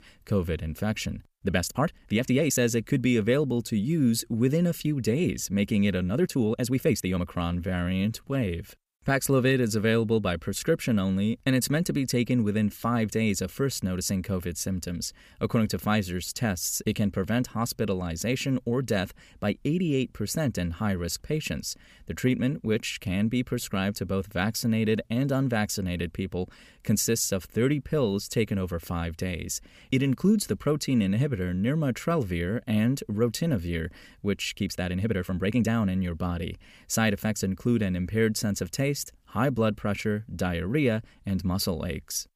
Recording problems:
uneven, jittery; strongly; from 1.5 to 36 s

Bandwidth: 15 kHz